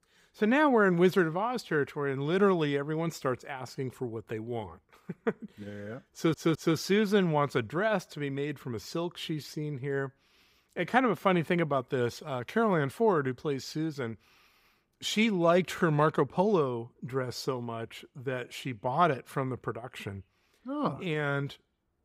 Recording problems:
audio stuttering; at 6 s

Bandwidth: 15.5 kHz